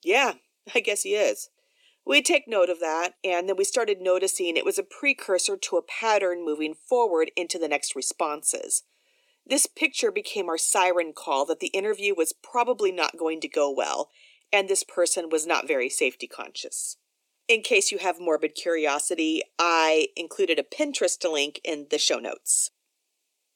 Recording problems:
thin; somewhat; fading below 300 Hz

